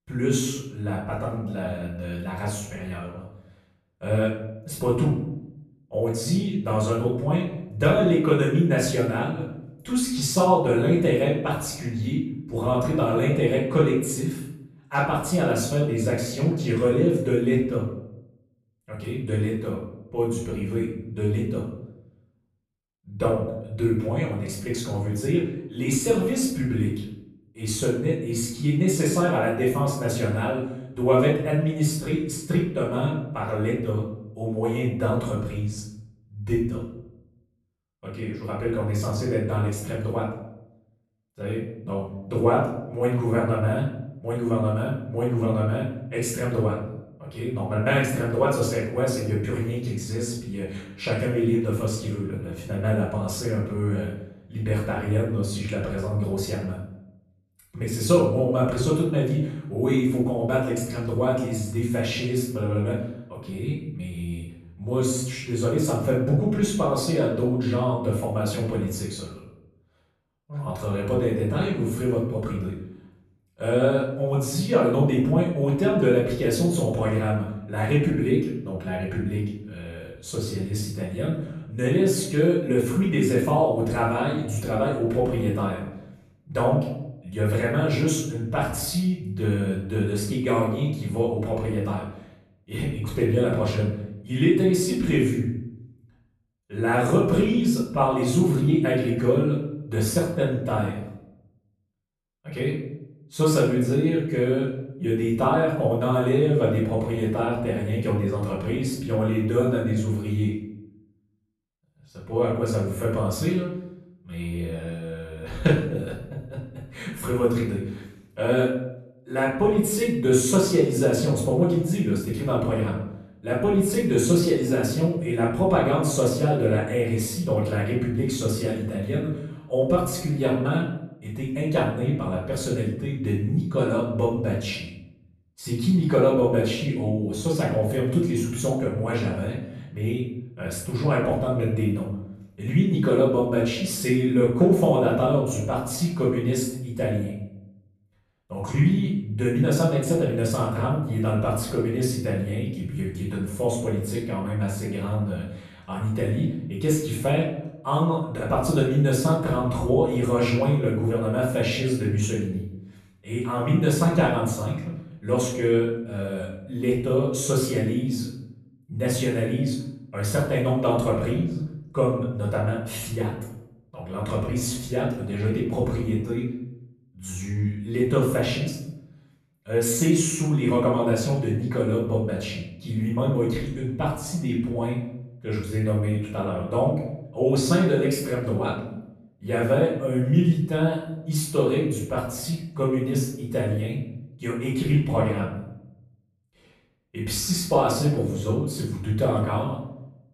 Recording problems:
off-mic speech; far
room echo; noticeable; dies away in 0.7 s

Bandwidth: 13.5 kHz